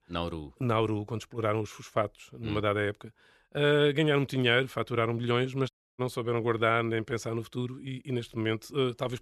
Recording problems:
audio cutting out; at 5.5 s

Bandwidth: 13.5 kHz